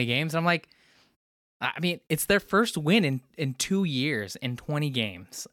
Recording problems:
abrupt cut into speech; at the start

